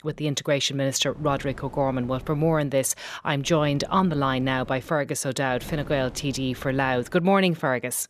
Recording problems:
wind noise on the microphone; occasional gusts; from 1 to 2.5 s, from 3.5 to 5 s and from 5.5 to 7 s; 25 dB below the speech

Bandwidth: 14 kHz